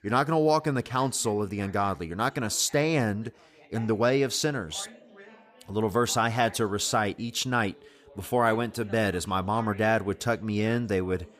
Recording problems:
background chatter; faint; throughout; 2 voices, 25 dB below the speech

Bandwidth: 15 kHz